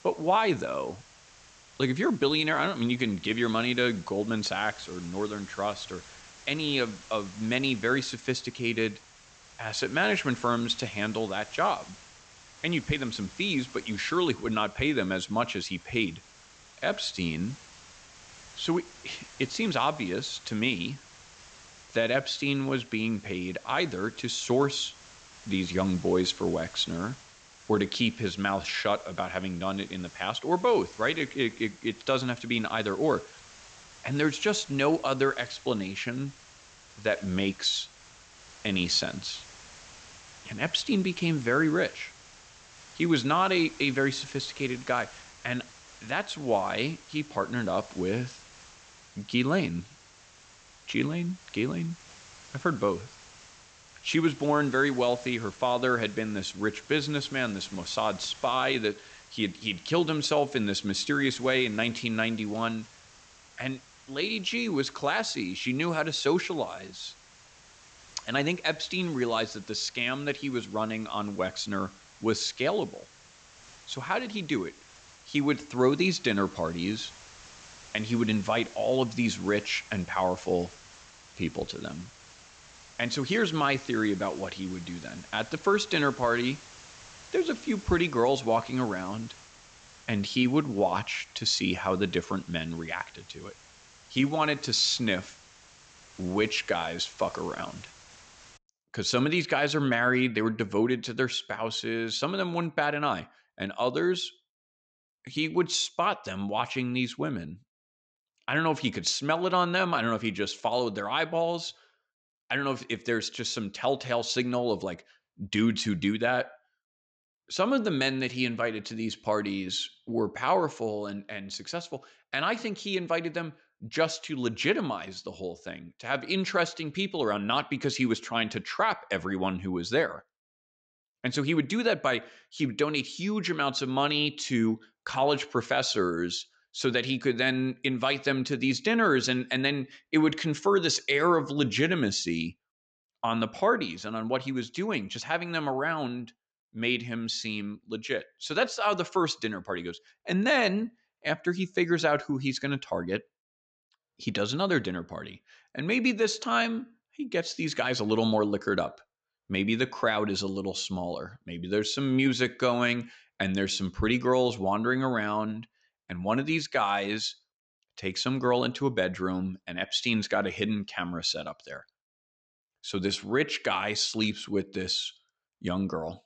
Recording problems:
high frequencies cut off; noticeable; nothing above 8 kHz
hiss; faint; until 1:39; 20 dB below the speech

